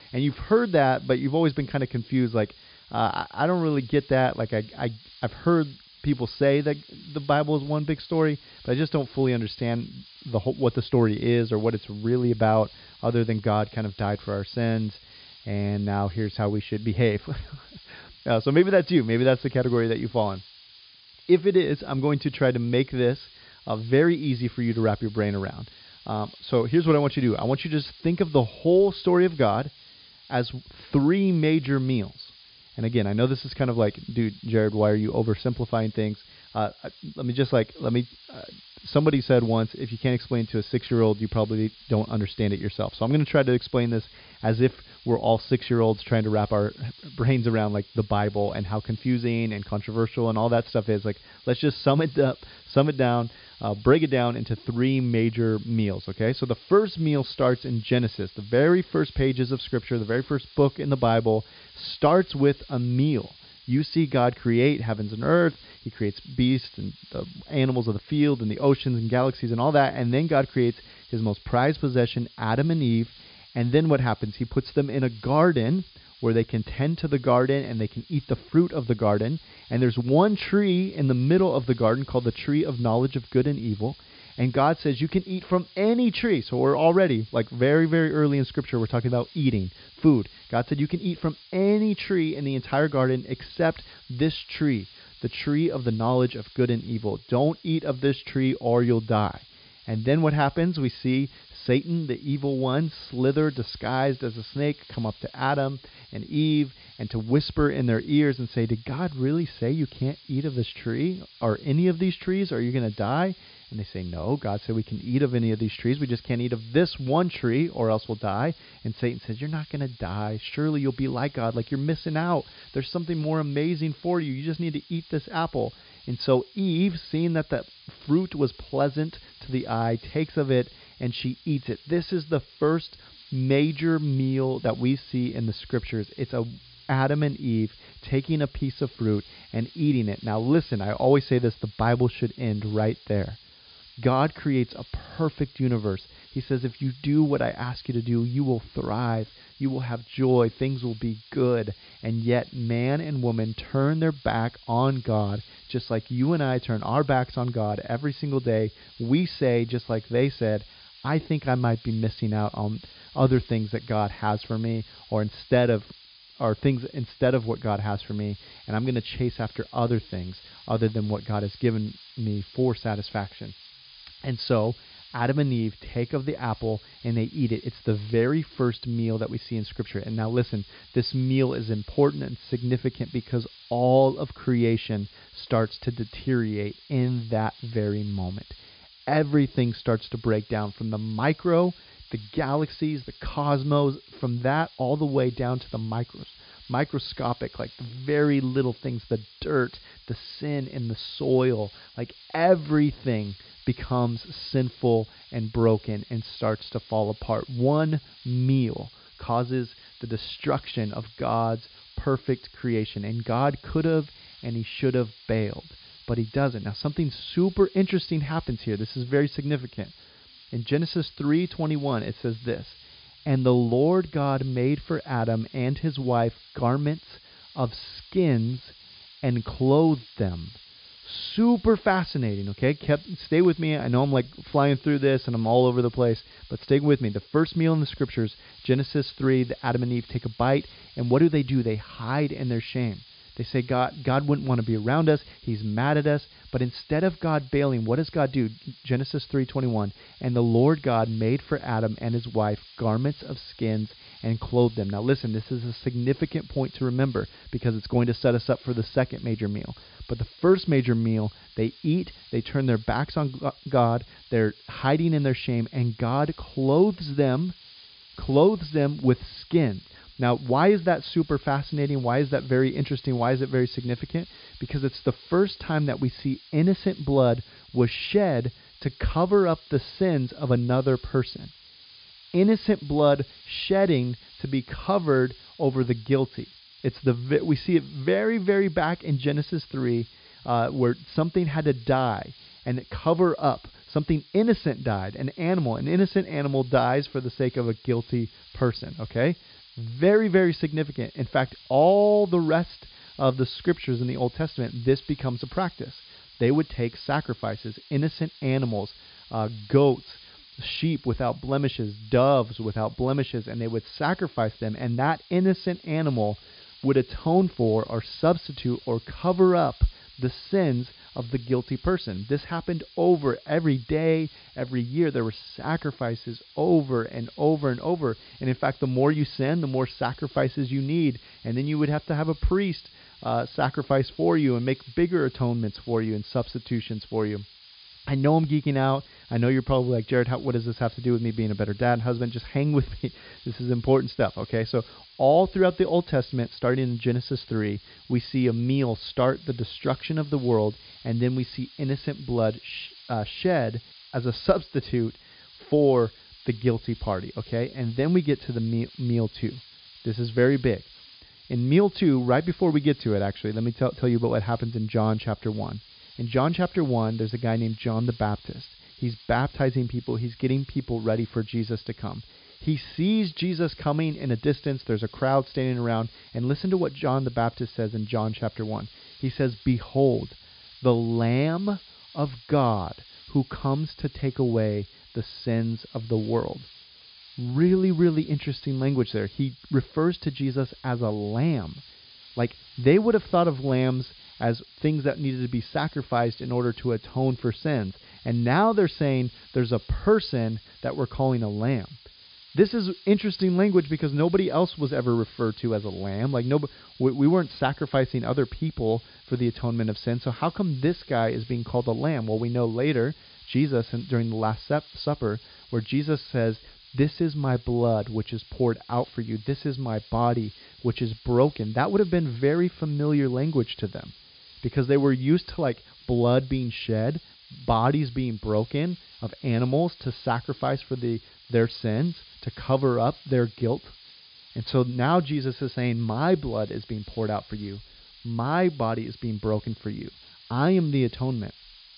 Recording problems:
high frequencies cut off; severe; nothing above 5 kHz
hiss; faint; throughout; 20 dB below the speech

